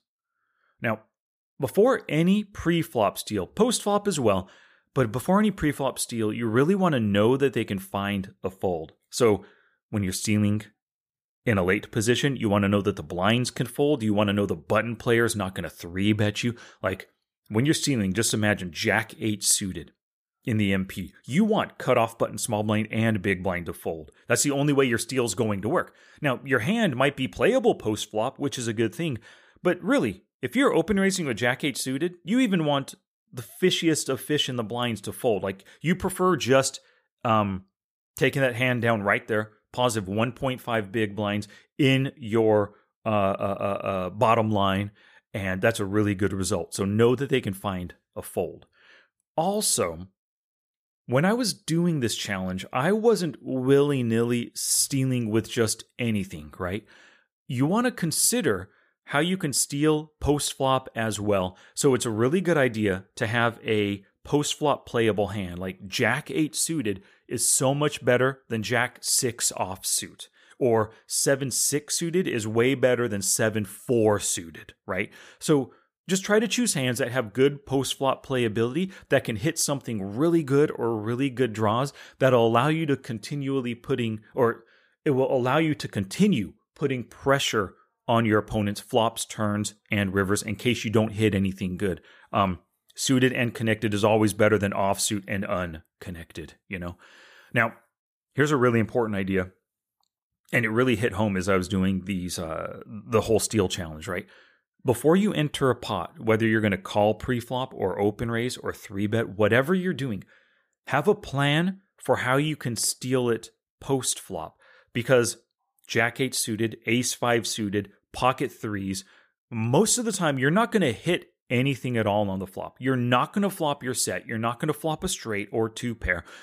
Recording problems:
none

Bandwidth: 15 kHz